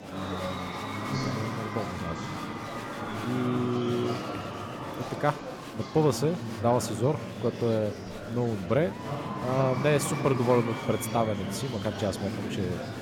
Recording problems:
murmuring crowd; loud; throughout; 5 dB below the speech

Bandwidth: 17.5 kHz